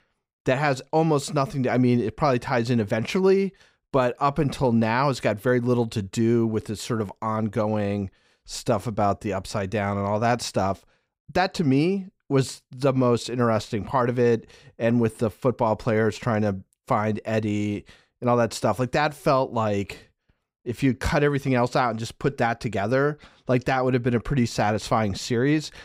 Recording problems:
none

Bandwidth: 15.5 kHz